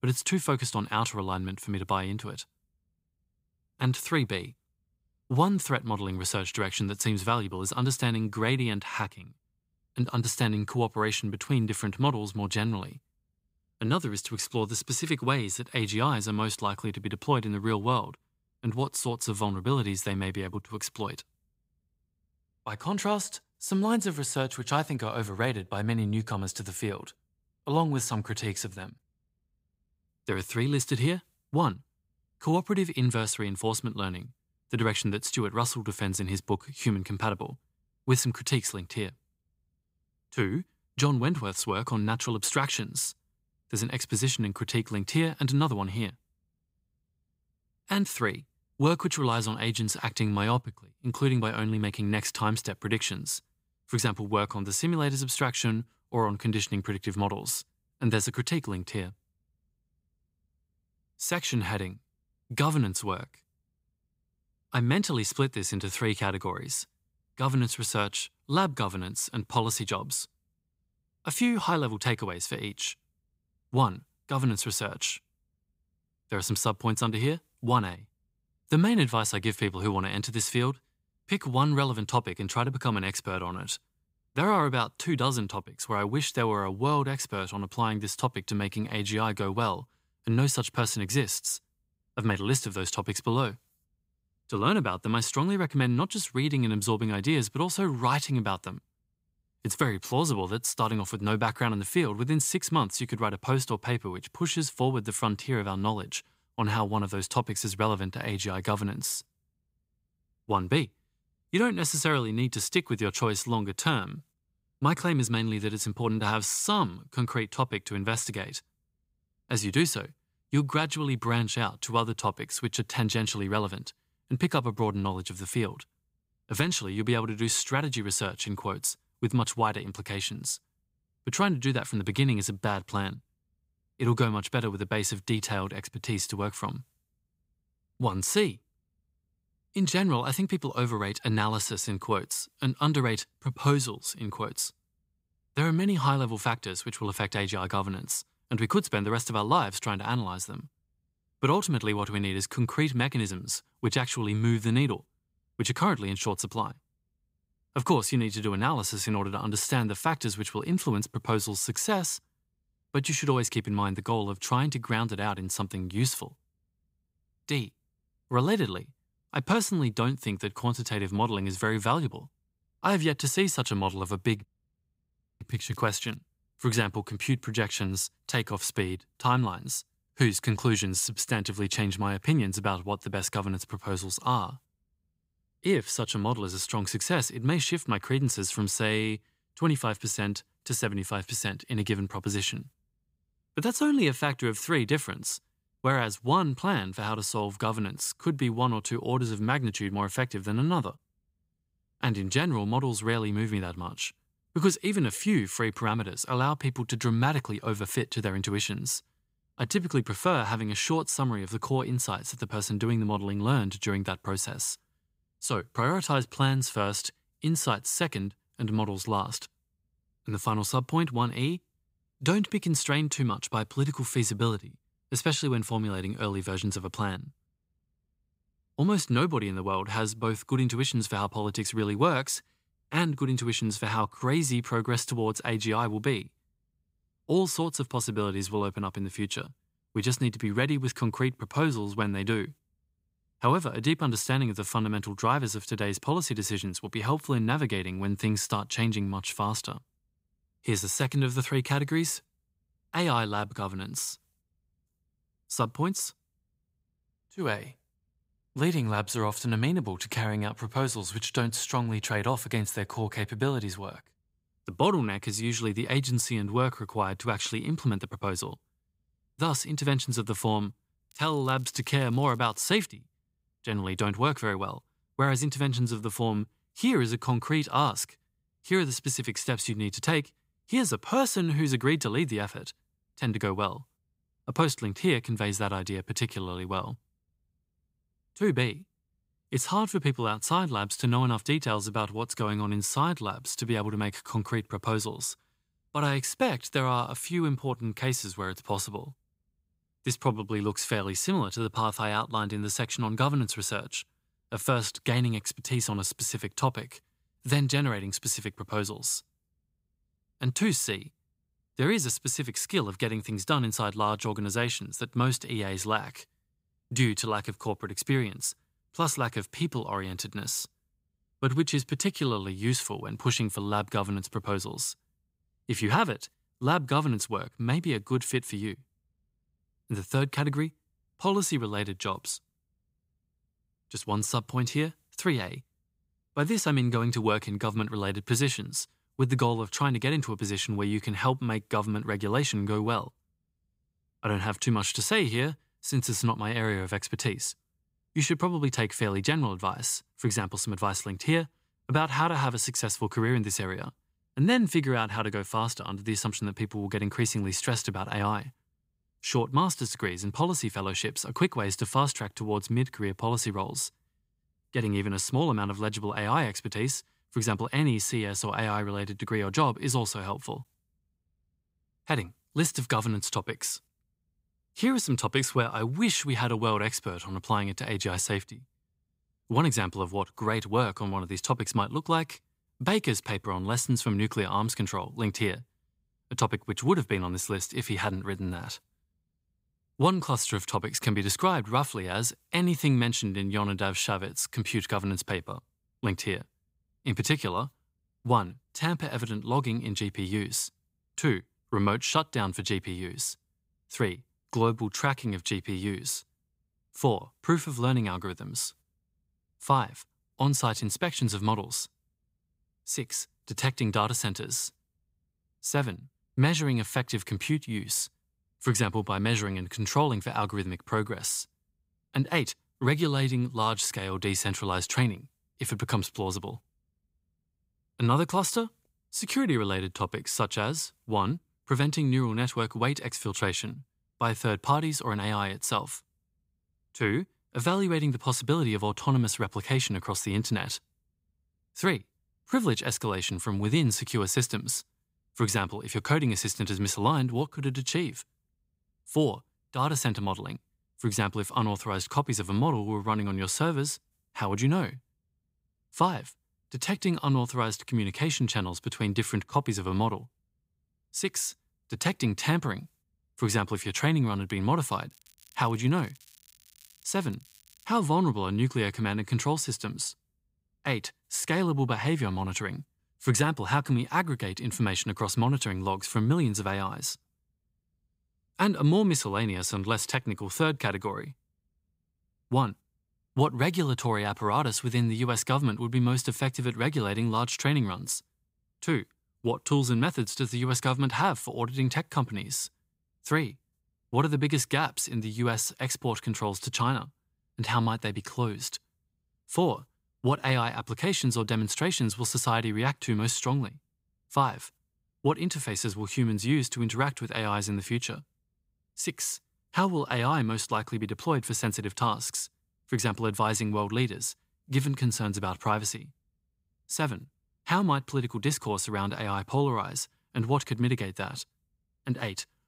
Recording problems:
crackling; faint; at 2:55, from 4:31 to 4:33 and from 7:45 to 7:48; 30 dB below the speech

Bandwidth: 15.5 kHz